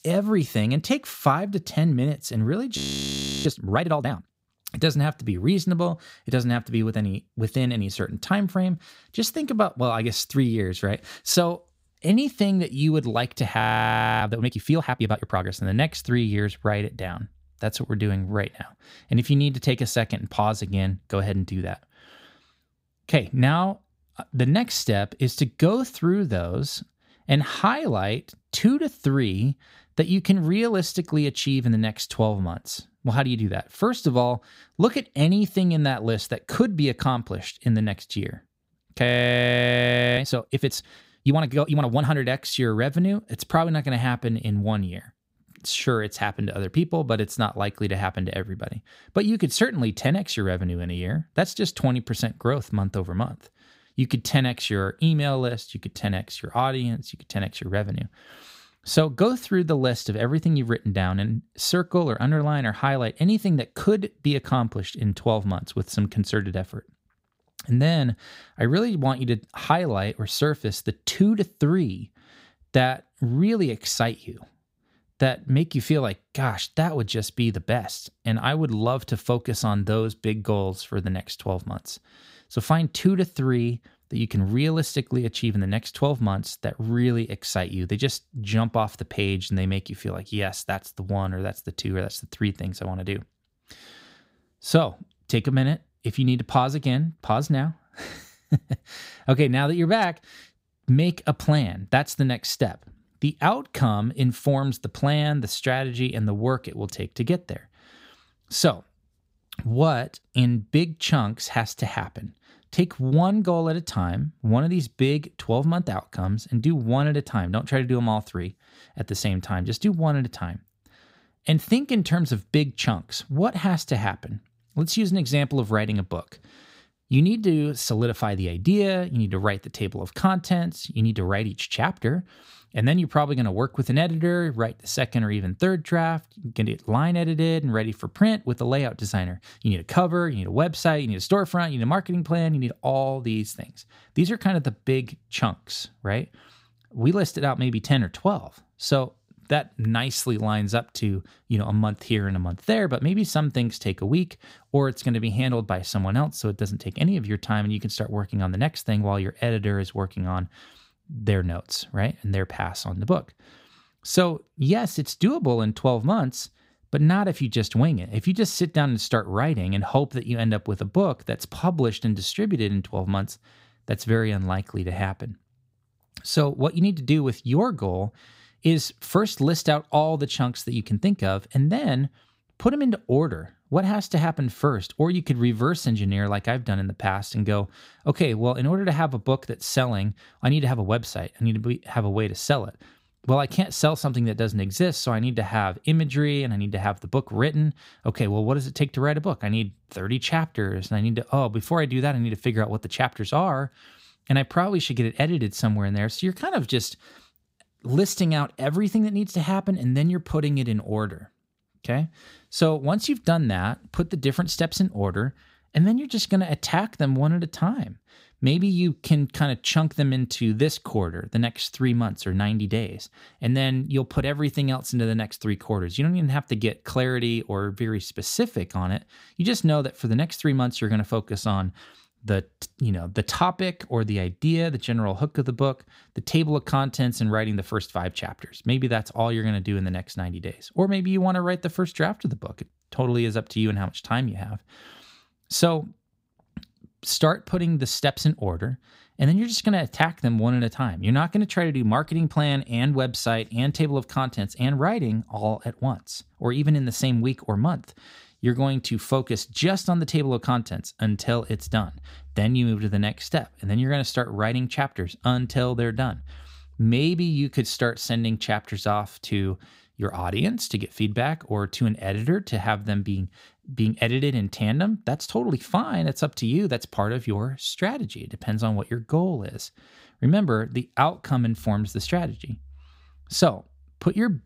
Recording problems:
audio freezing; at 3 s for 0.5 s, at 14 s for 0.5 s and at 39 s for 1 s

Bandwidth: 15.5 kHz